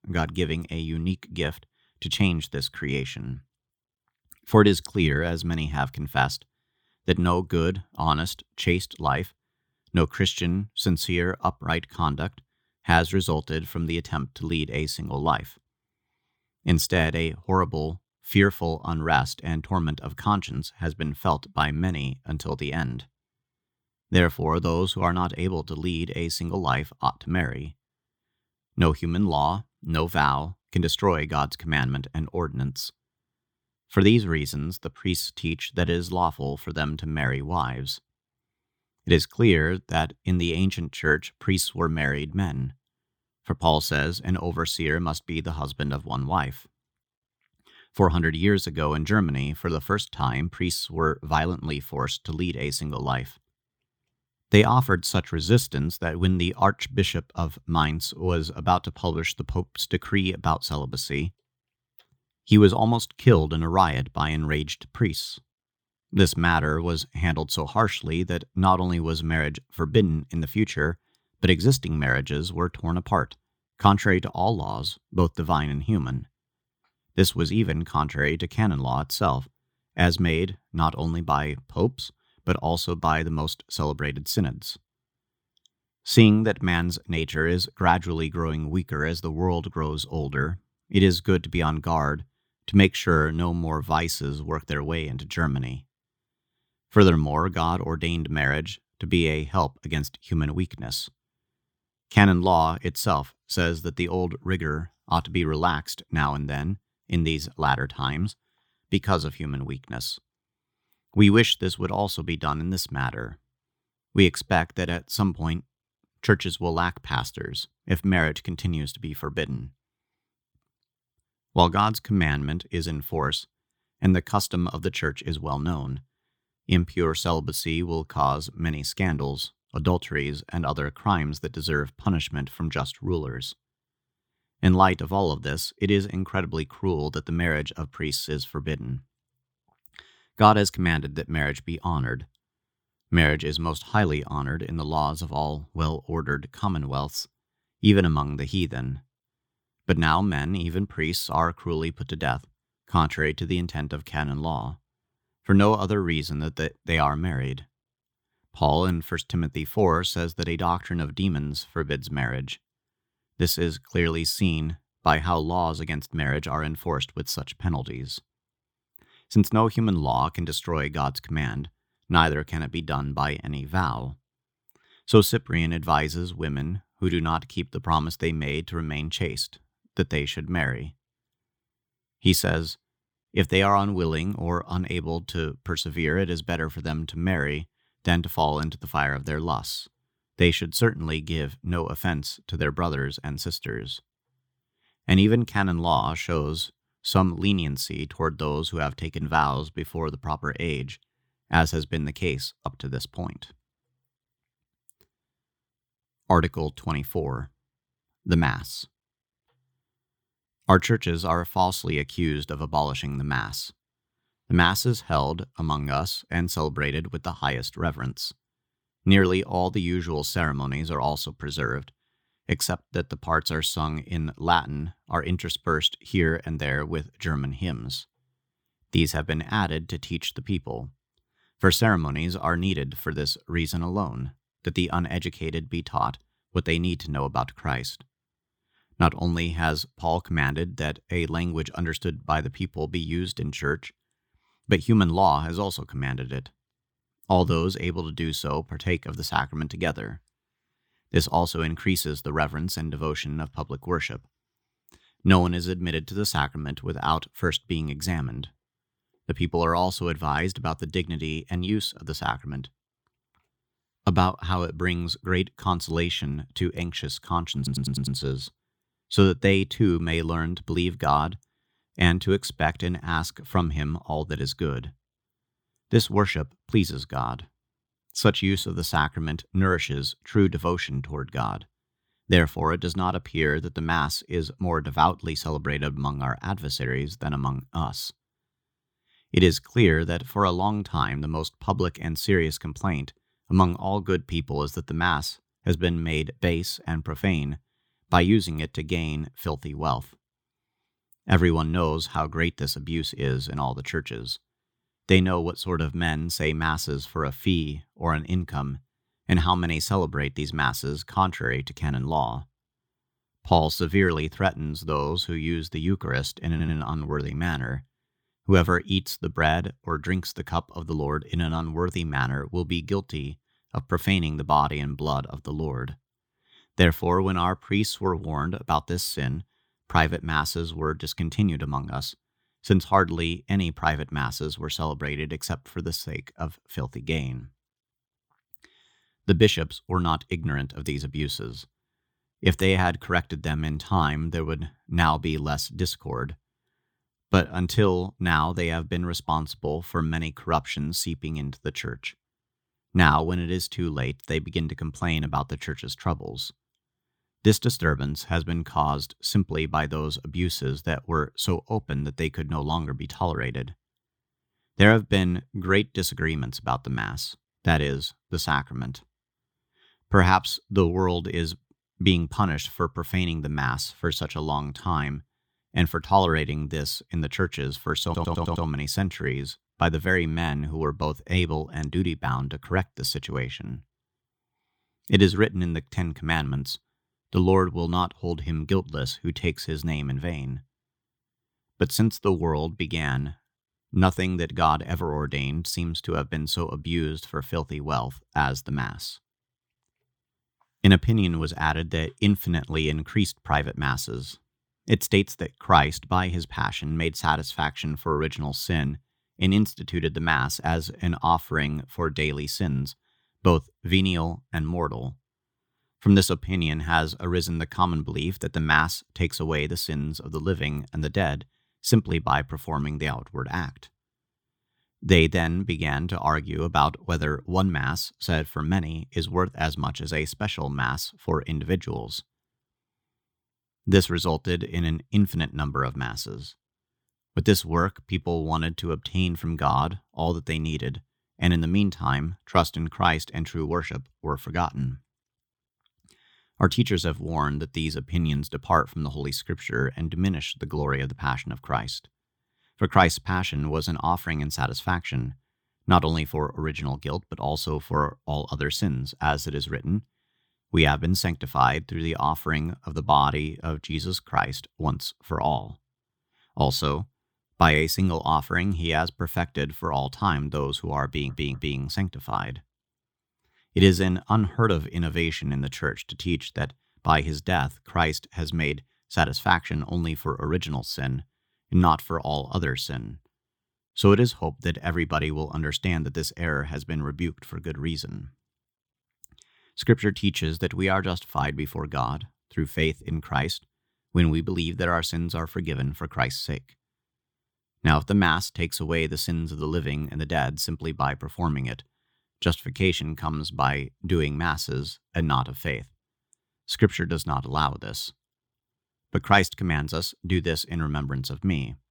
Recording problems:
audio stuttering; 4 times, first at 4:28

